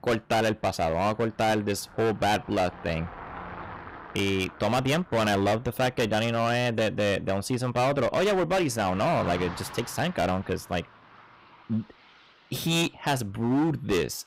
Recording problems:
distortion; heavy; 15% of the sound clipped
traffic noise; noticeable; throughout; 15 dB below the speech

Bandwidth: 15.5 kHz